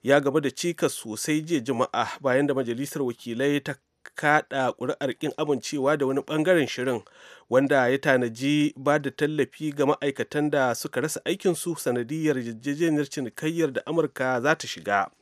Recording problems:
none

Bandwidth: 14 kHz